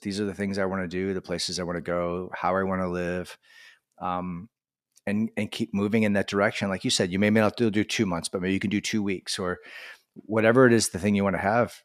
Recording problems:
none

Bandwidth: 14 kHz